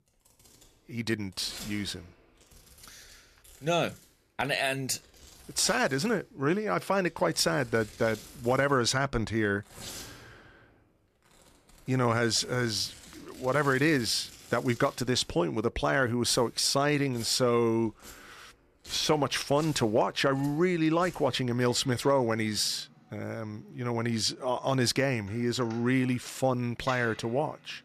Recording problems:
household noises; faint; throughout; 20 dB below the speech

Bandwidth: 14.5 kHz